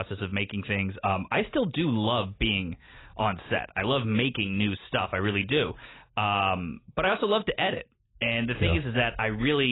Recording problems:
garbled, watery; badly; nothing above 4 kHz
abrupt cut into speech; at the start and the end

